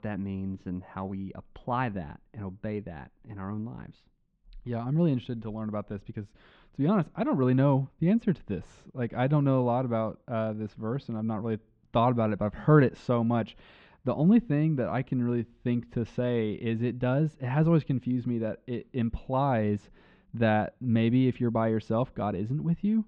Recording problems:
muffled; very; fading above 3 kHz

